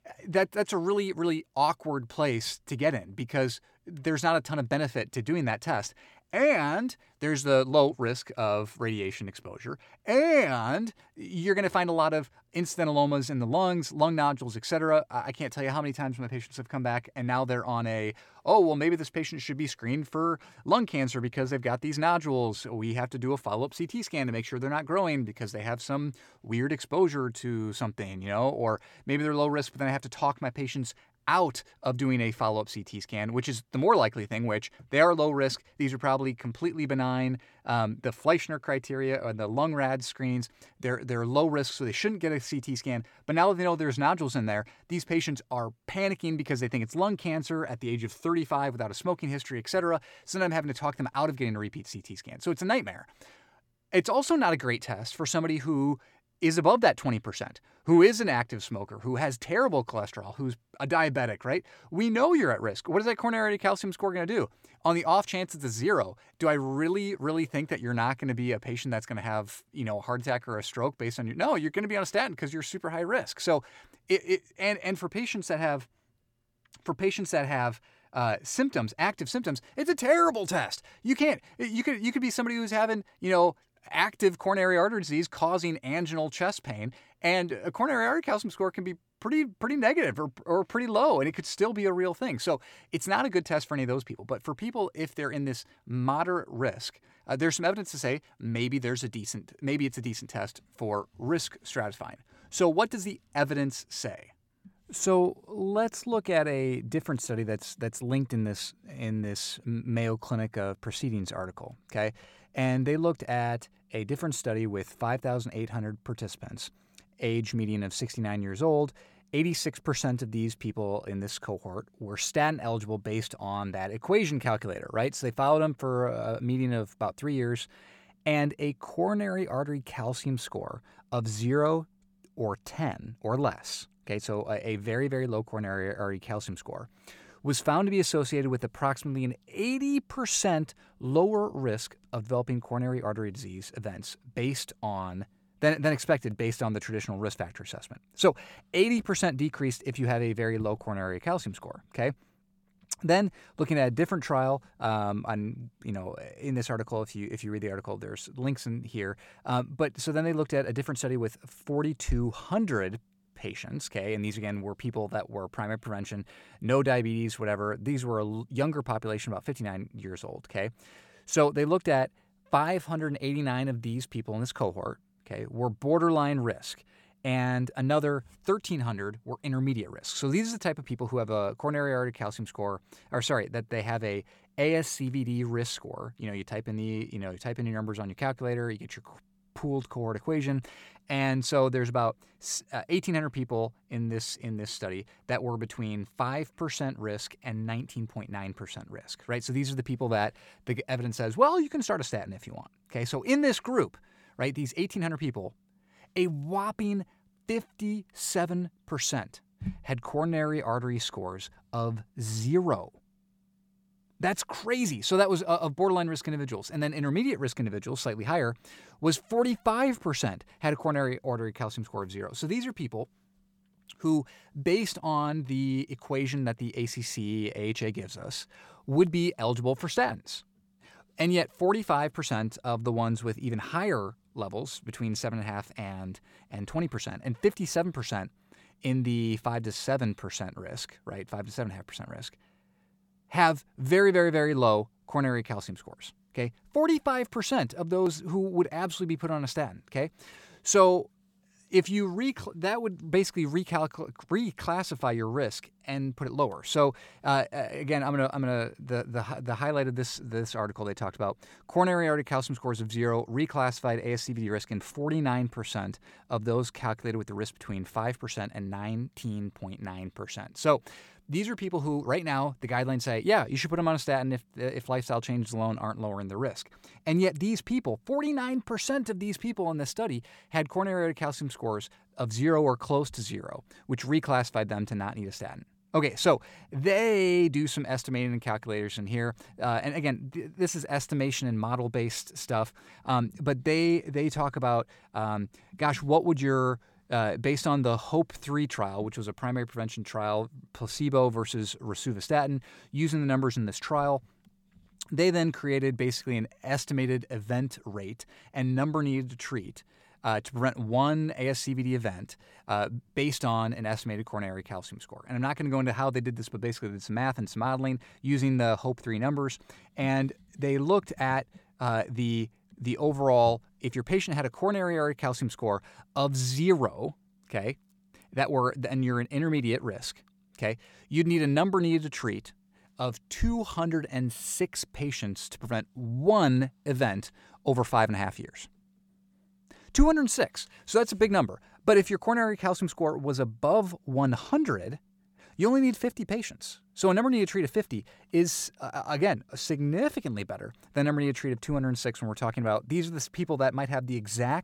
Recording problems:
none

